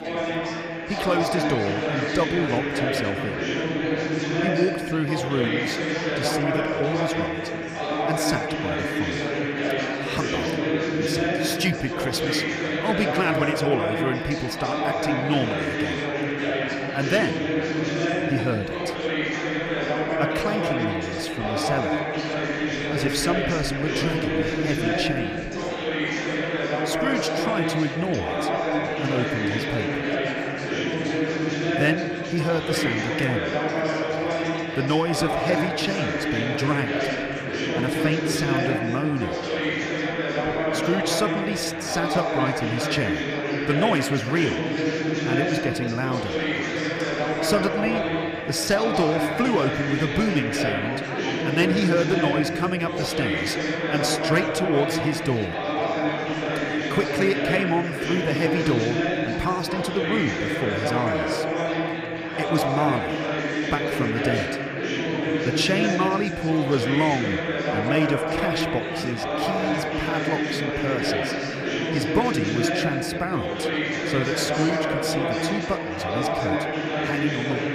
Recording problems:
chatter from many people; very loud; throughout; 2 dB above the speech

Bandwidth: 15 kHz